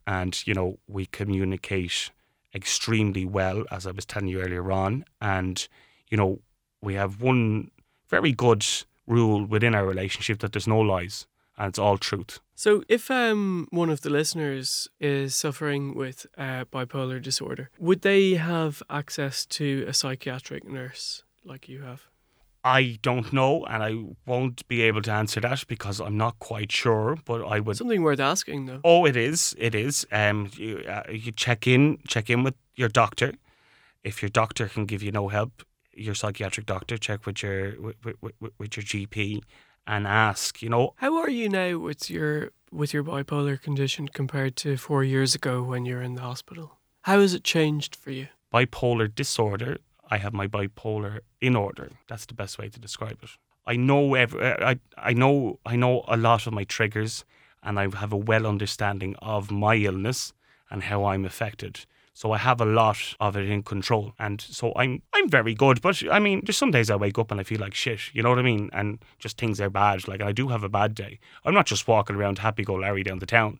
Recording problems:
none

